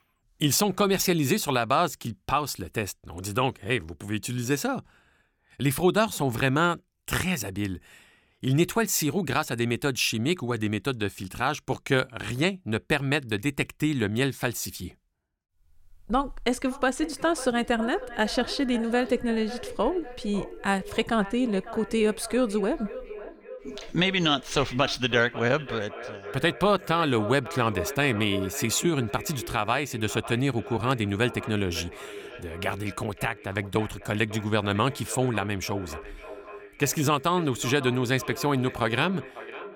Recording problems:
echo of what is said; noticeable; from 17 s on; 550 ms later, 15 dB below the speech

